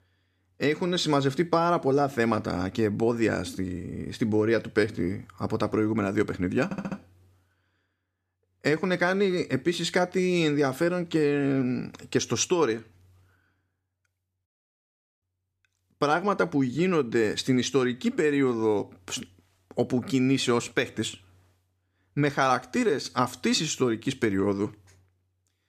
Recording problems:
audio stuttering; at 6.5 s

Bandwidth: 14.5 kHz